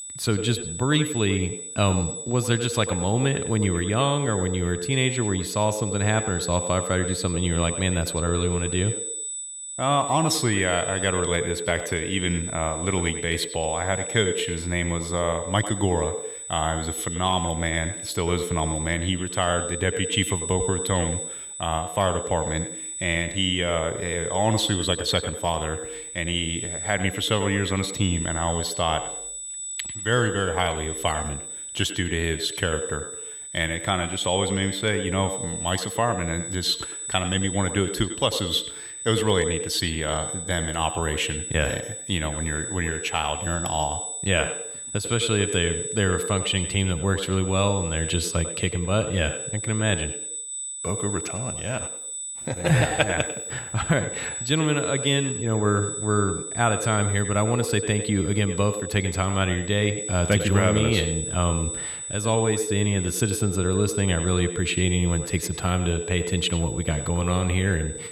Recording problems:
echo of what is said; strong; throughout; 100 ms later, 9 dB below the speech
high-pitched whine; loud; throughout; 8 kHz, 6 dB below the speech

